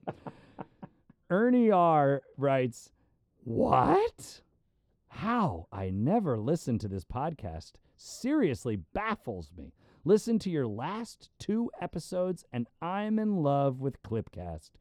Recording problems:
muffled; slightly; fading above 1 kHz

